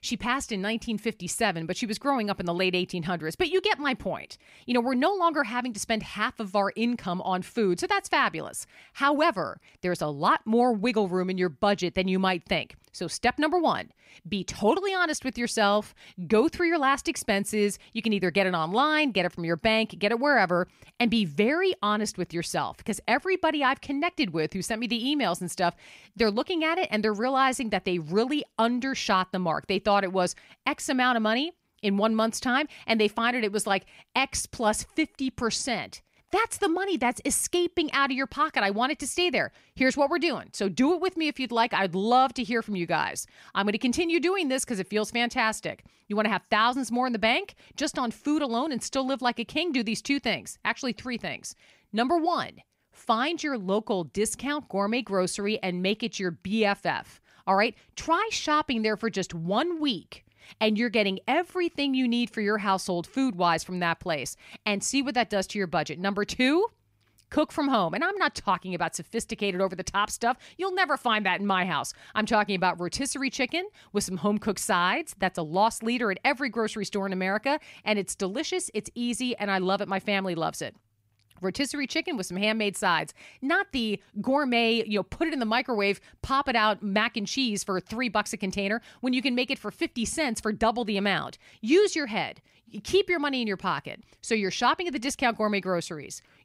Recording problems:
none

